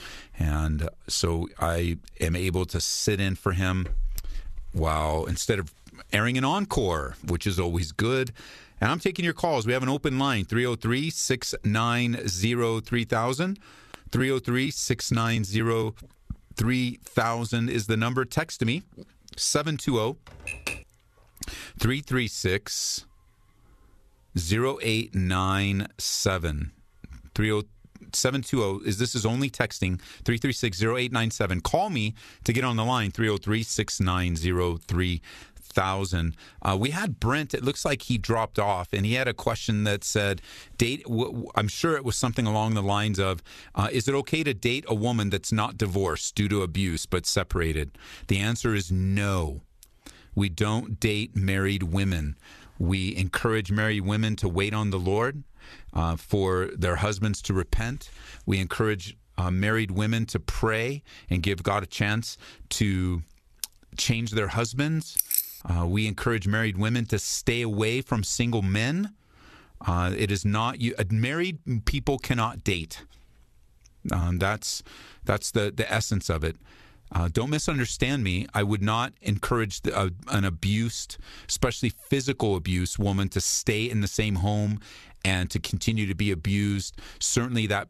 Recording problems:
squashed, flat; somewhat
keyboard typing; noticeable; at 20 s; peak 5 dB below the speech
jangling keys; loud; at 1:05; peak 3 dB above the speech

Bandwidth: 13.5 kHz